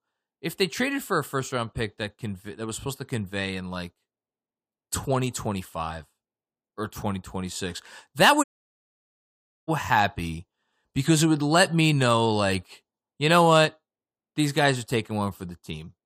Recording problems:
audio cutting out; at 8.5 s for 1 s

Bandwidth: 15 kHz